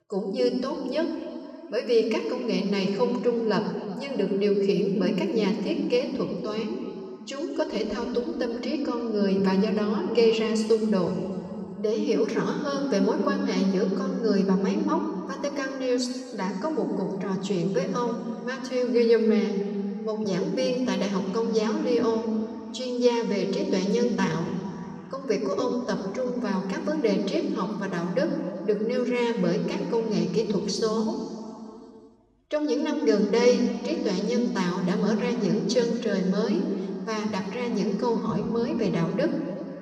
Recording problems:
room echo; noticeable; dies away in 2.4 s
off-mic speech; somewhat distant

